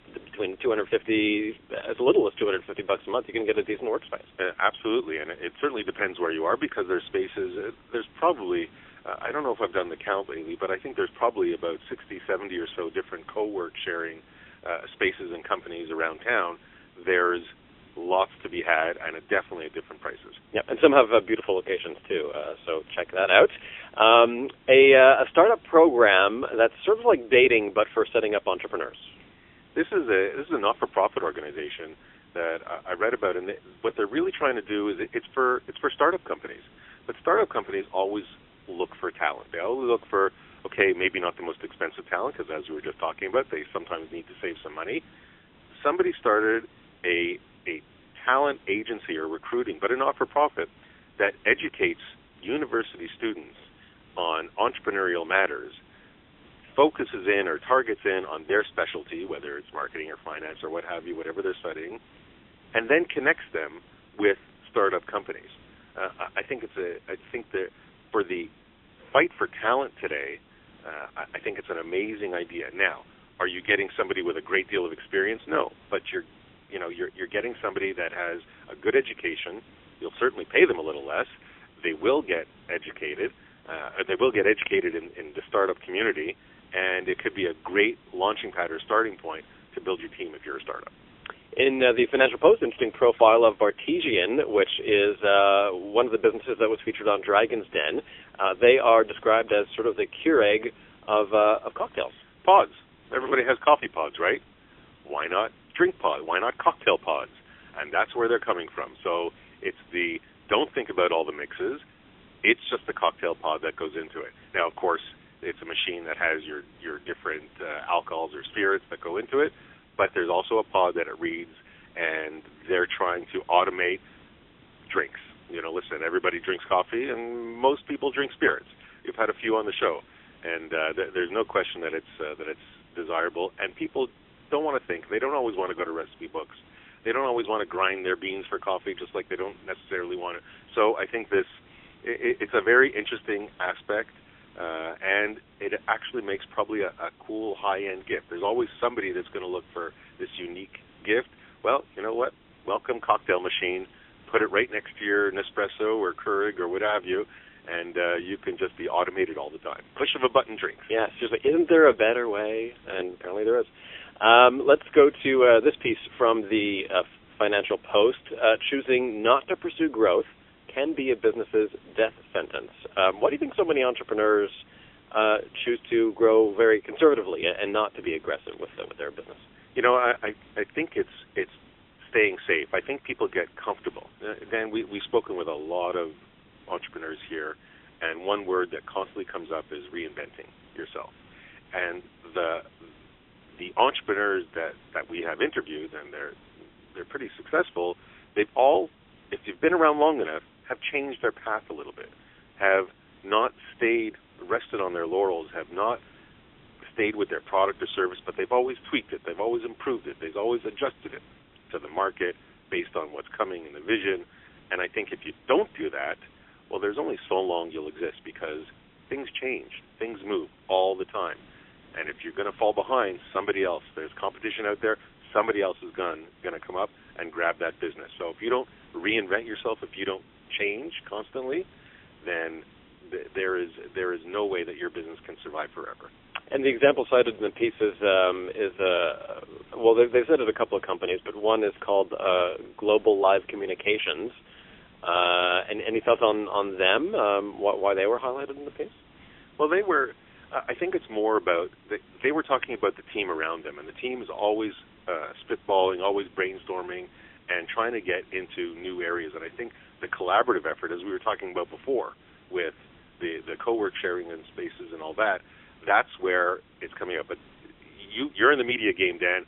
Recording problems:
phone-call audio; poor line; nothing above 3.5 kHz
hiss; faint; throughout; 30 dB below the speech

